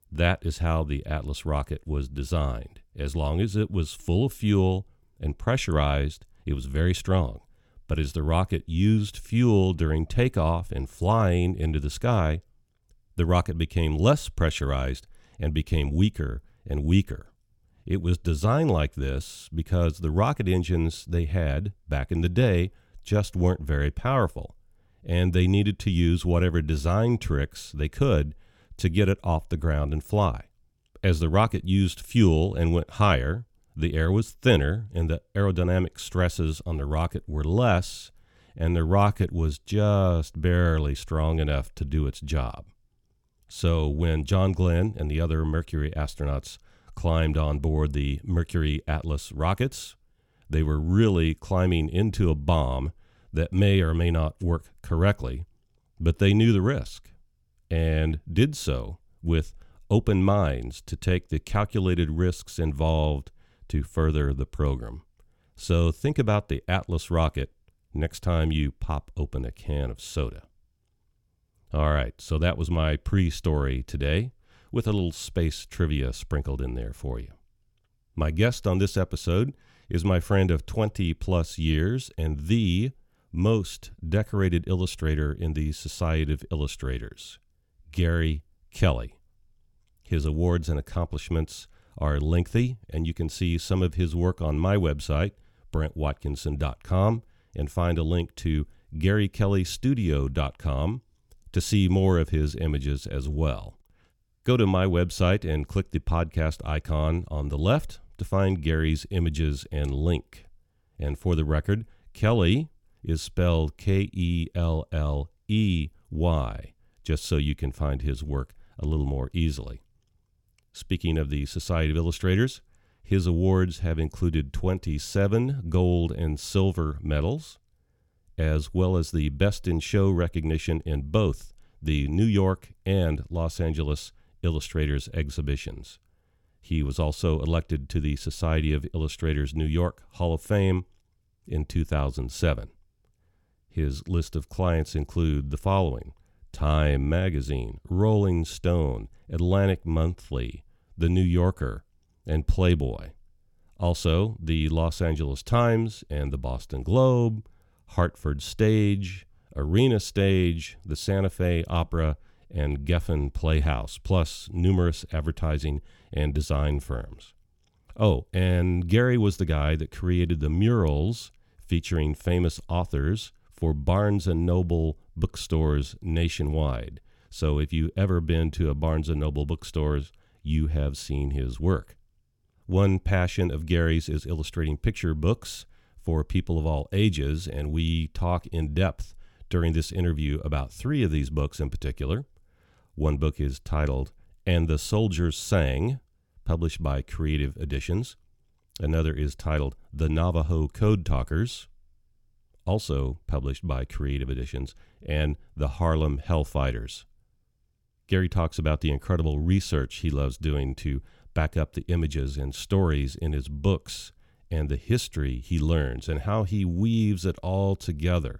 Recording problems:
none

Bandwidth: 17 kHz